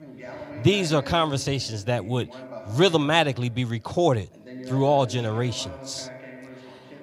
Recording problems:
voice in the background; noticeable; throughout; 15 dB below the speech

